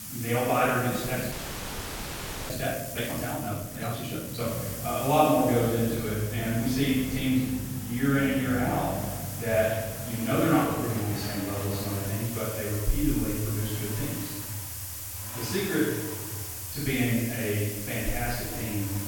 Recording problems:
room echo; strong; dies away in 1.2 s
off-mic speech; far
hiss; loud; throughout; 8 dB below the speech
traffic noise; noticeable; throughout; 10 dB below the speech
audio freezing; at 1.5 s for 1 s

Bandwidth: 17 kHz